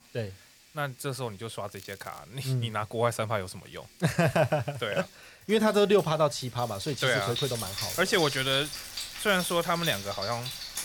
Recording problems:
household noises; loud; throughout; 7 dB below the speech
crackling; faint; at 1.5 s and from 8 to 9.5 s; 20 dB below the speech

